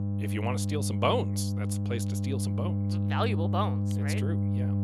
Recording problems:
electrical hum; loud; throughout; 50 Hz, 6 dB below the speech

